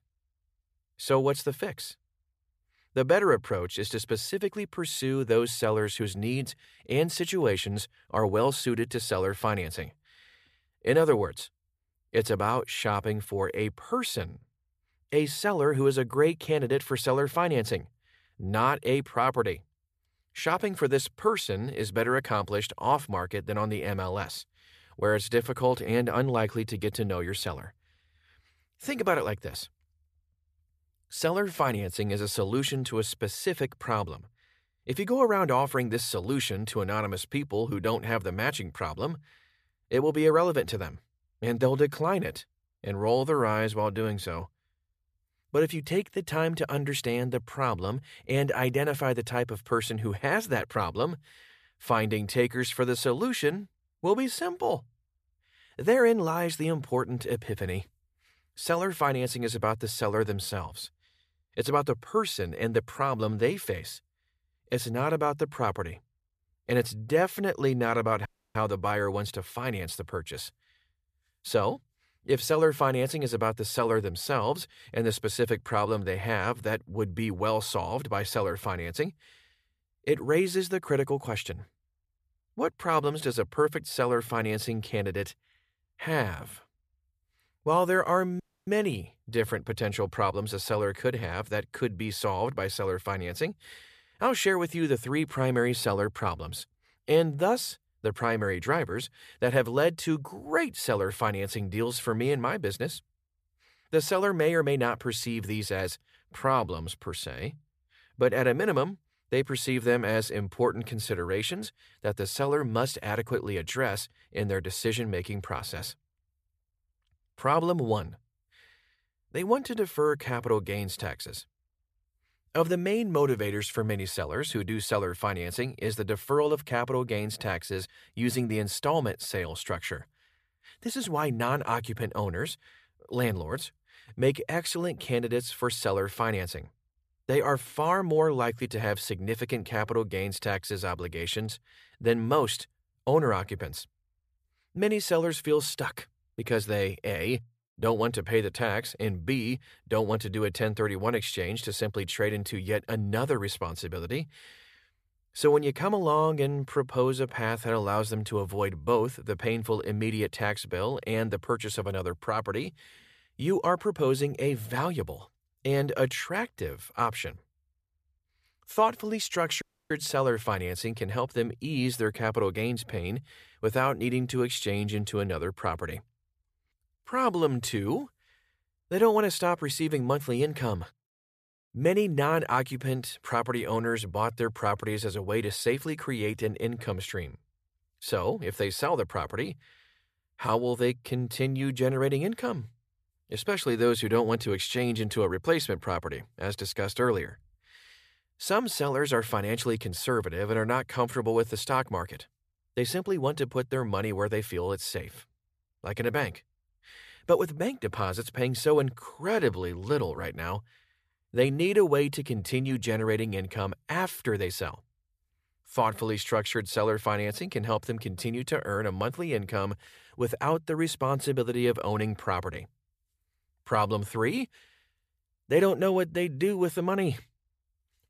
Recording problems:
audio cutting out; at 1:08, at 1:28 and at 2:50

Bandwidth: 14.5 kHz